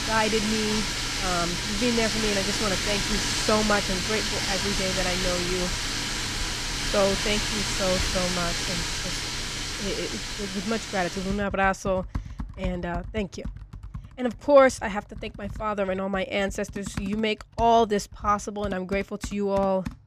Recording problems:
household noises; loud; throughout; as loud as the speech

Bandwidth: 14.5 kHz